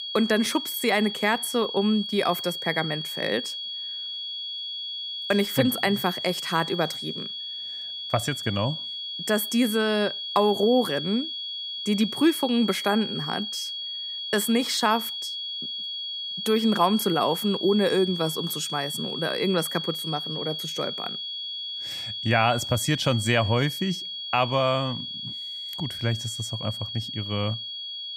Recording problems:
high-pitched whine; loud; throughout; 3.5 kHz, 5 dB below the speech

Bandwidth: 15.5 kHz